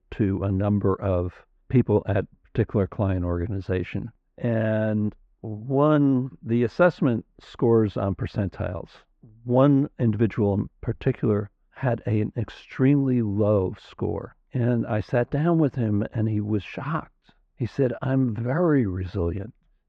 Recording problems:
muffled; very; fading above 2 kHz

